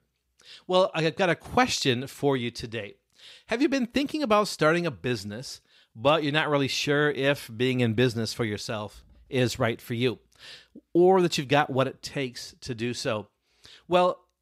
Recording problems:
none

